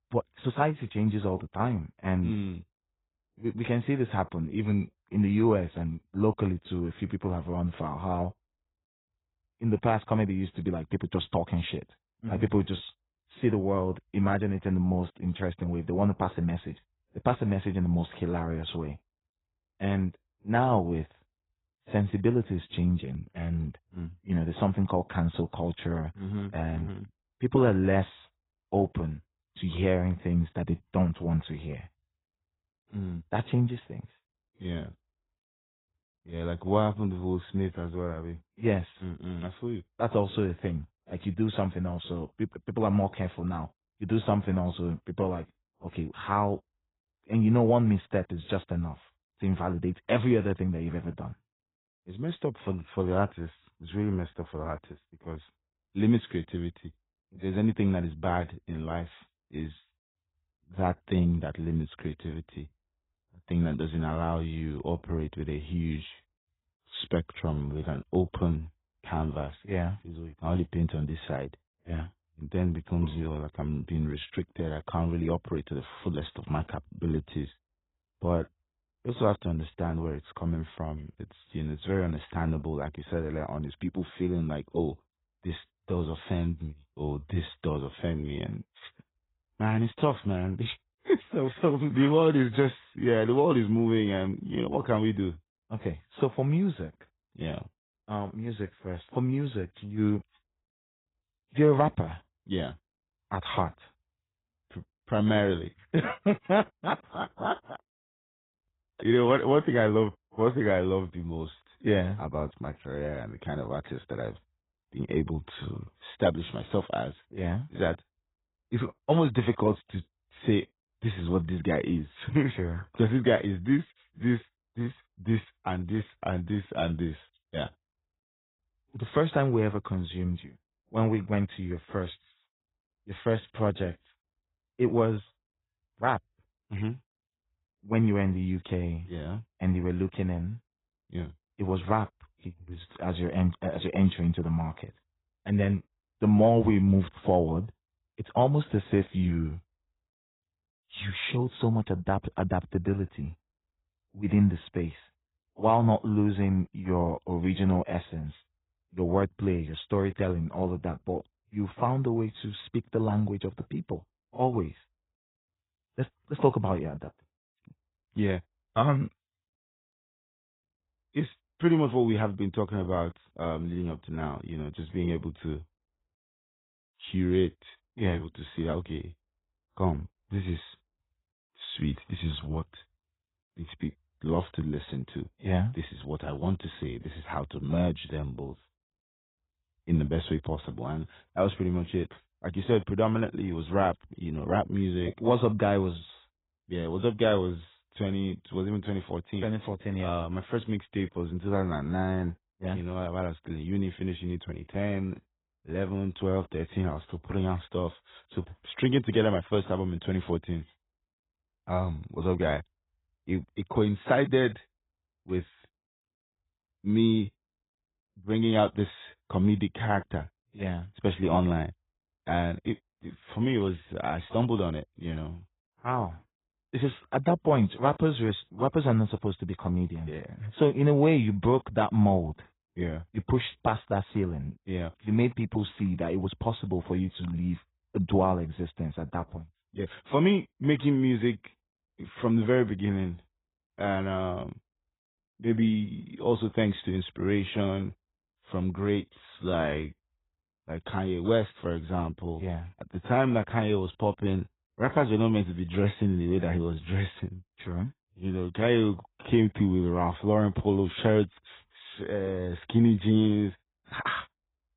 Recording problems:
garbled, watery; badly; nothing above 4 kHz

